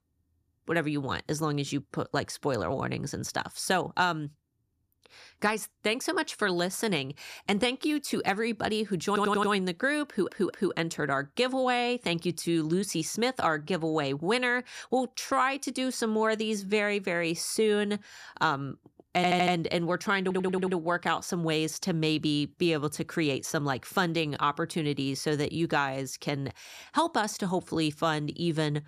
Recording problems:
audio stuttering; 4 times, first at 9 s

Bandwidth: 14.5 kHz